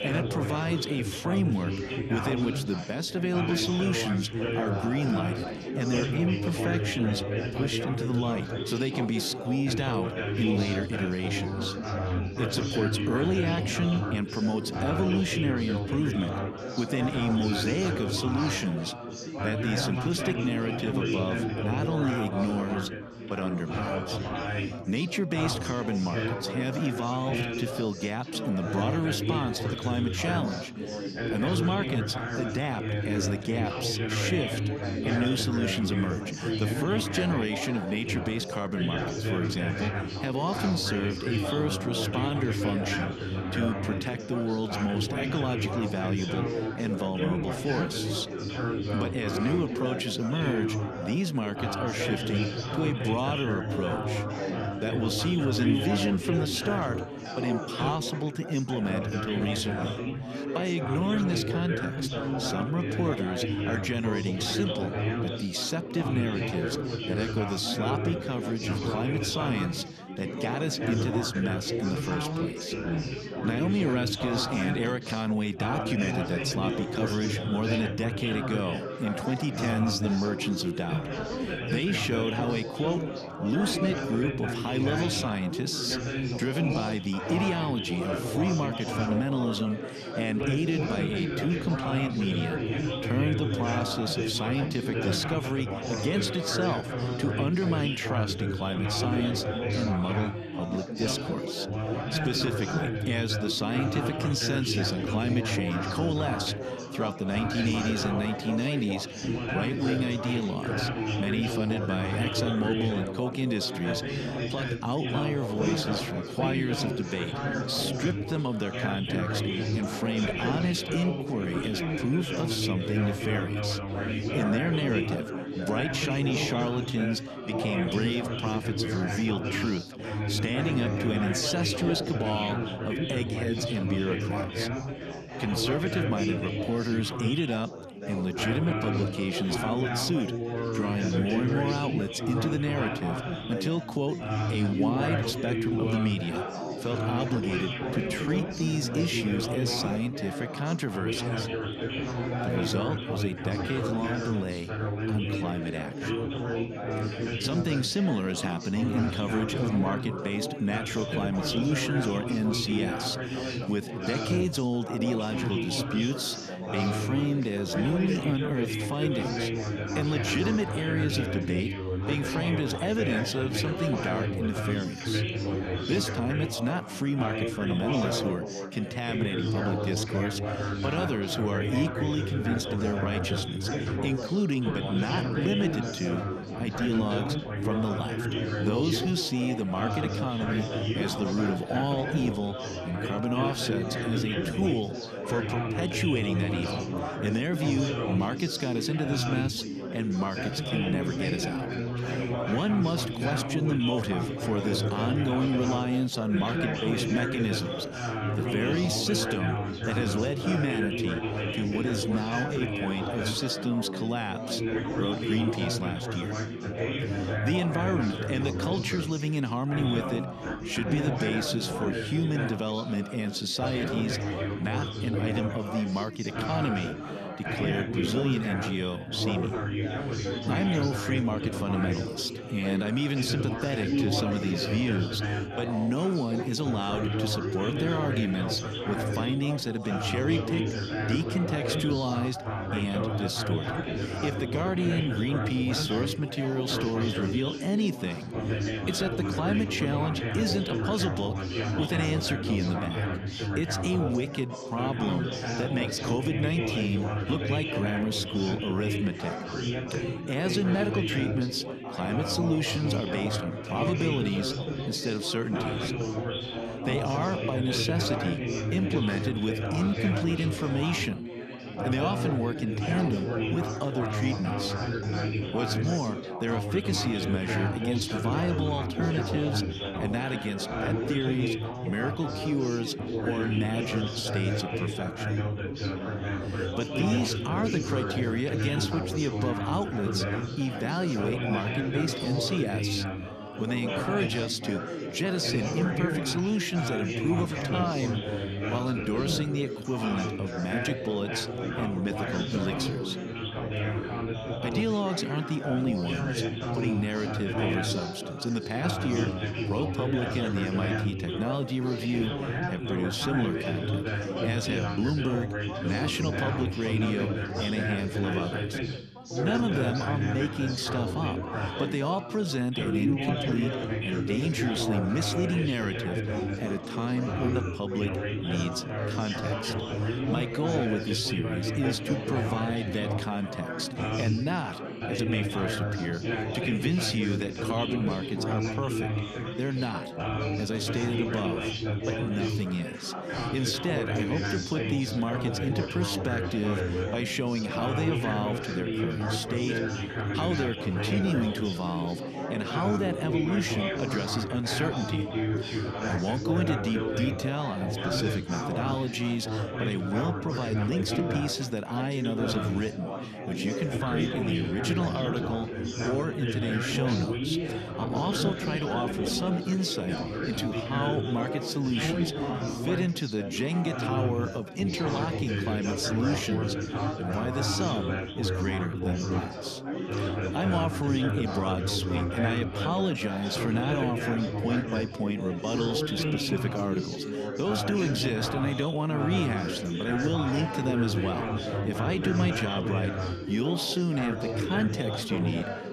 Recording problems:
chatter from many people; loud; throughout; 1 dB below the speech

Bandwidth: 14 kHz